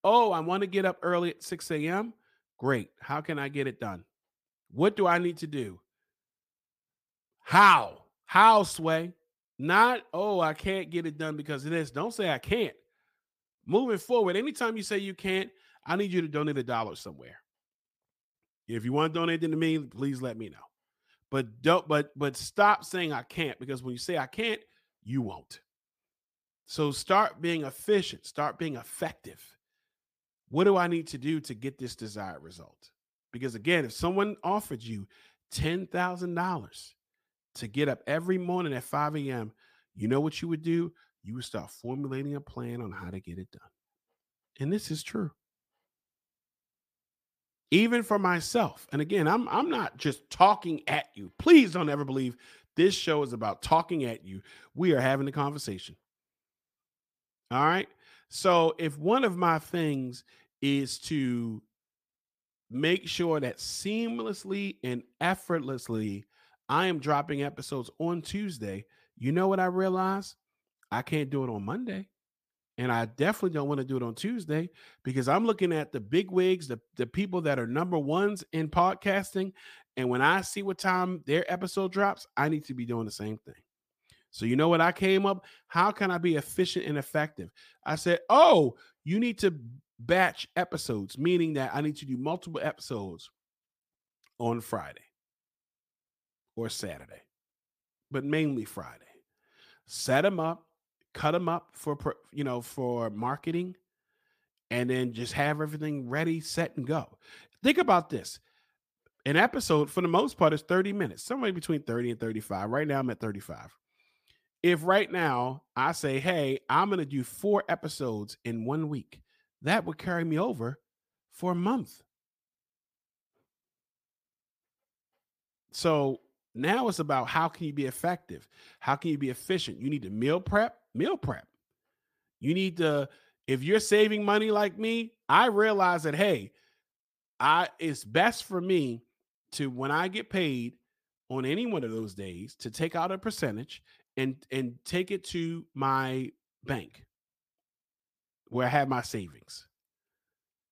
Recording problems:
none

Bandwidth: 15 kHz